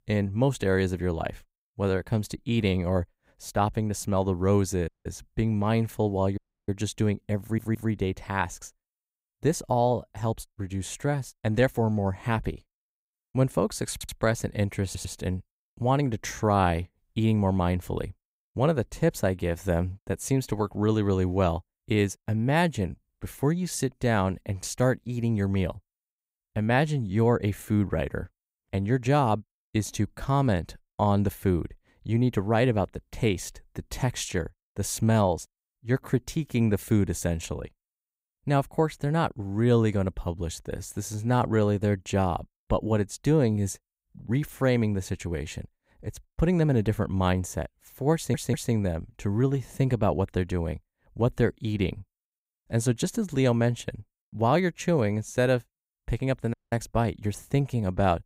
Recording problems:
audio cutting out; at 5 s, at 6.5 s and at 57 s
audio stuttering; 4 times, first at 7.5 s

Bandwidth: 15.5 kHz